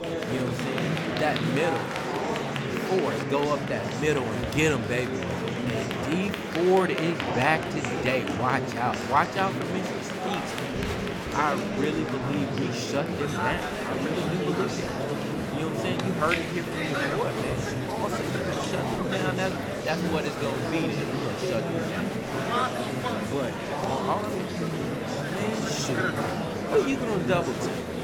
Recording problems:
murmuring crowd; very loud; throughout; as loud as the speech

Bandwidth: 17.5 kHz